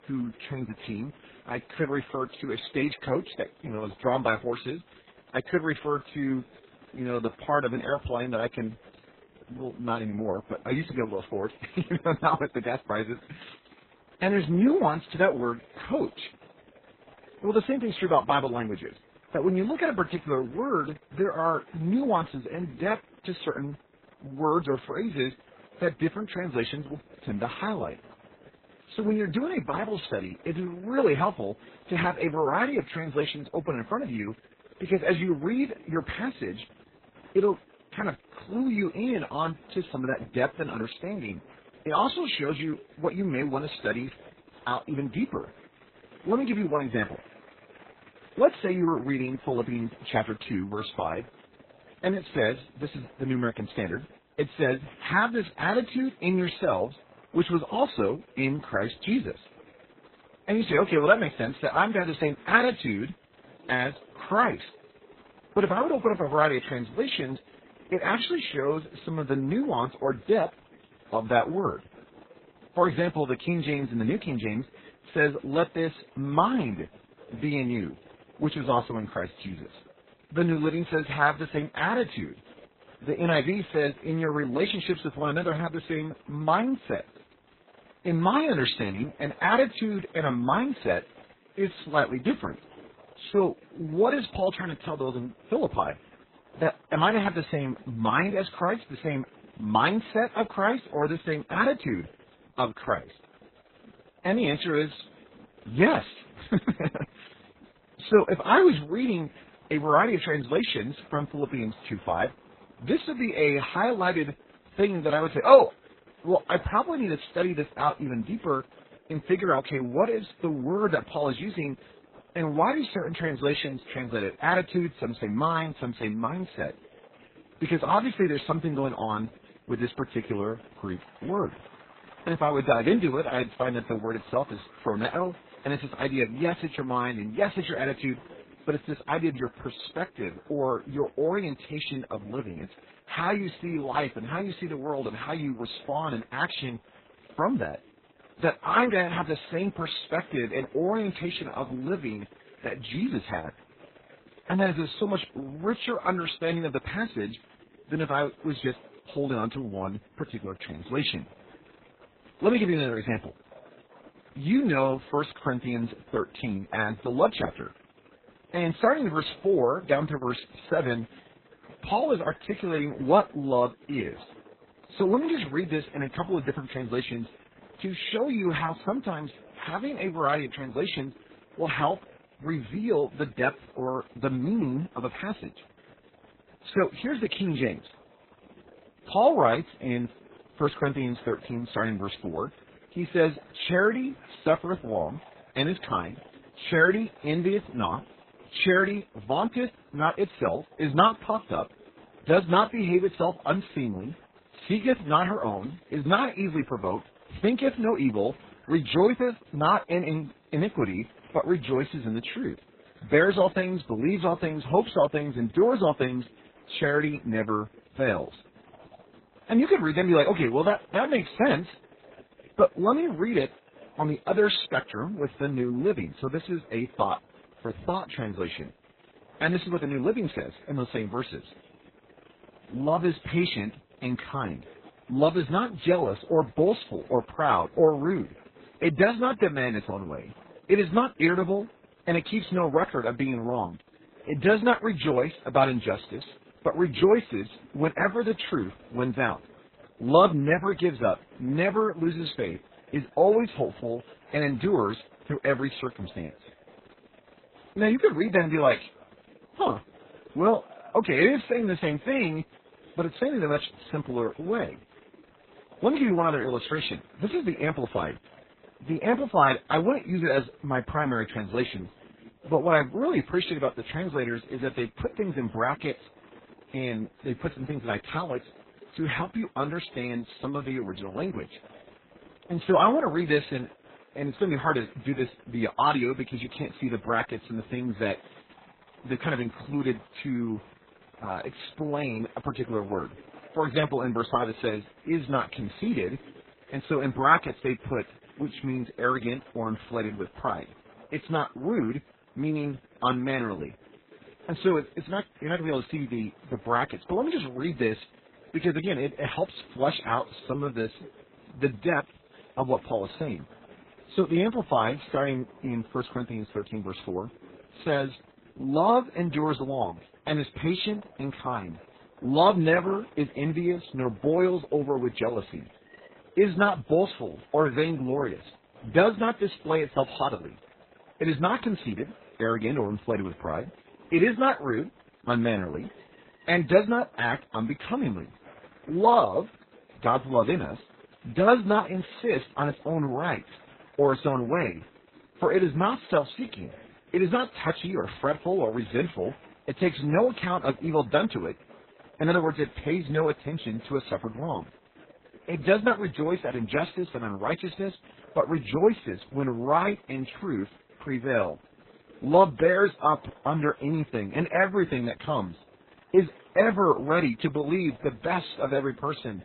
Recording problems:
garbled, watery; badly; nothing above 4 kHz
murmuring crowd; faint; throughout; 25 dB below the speech

